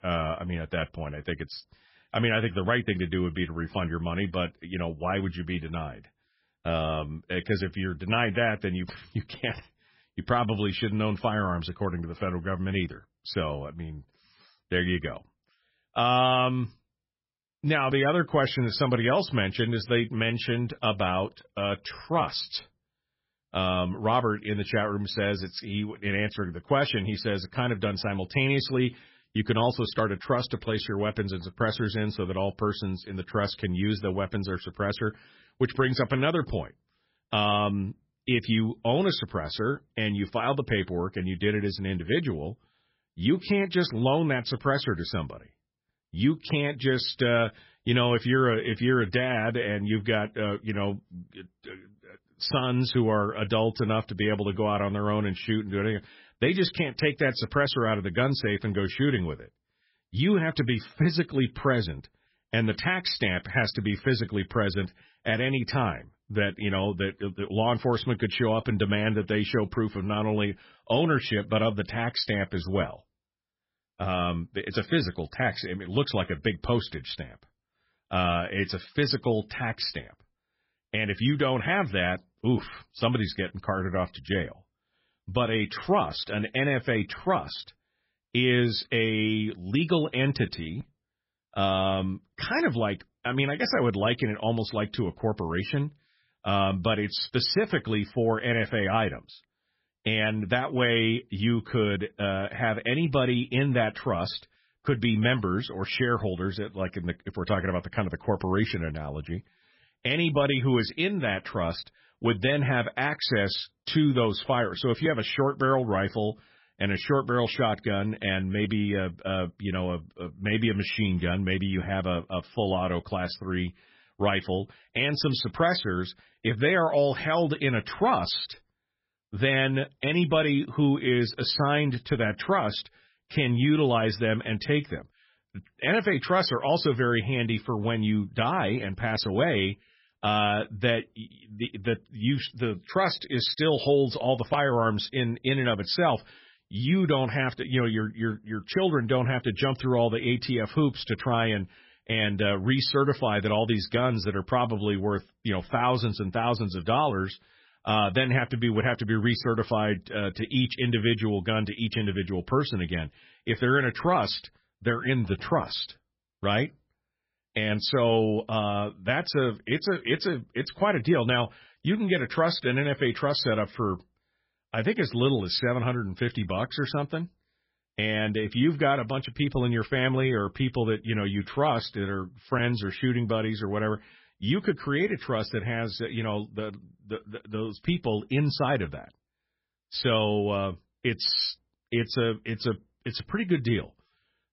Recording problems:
garbled, watery; badly; nothing above 5.5 kHz

